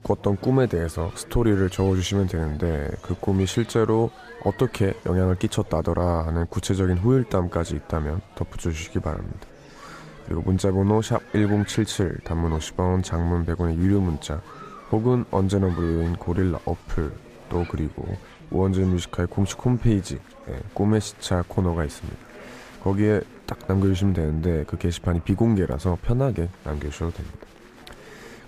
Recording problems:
chatter from many people; faint; throughout; 20 dB below the speech

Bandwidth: 15 kHz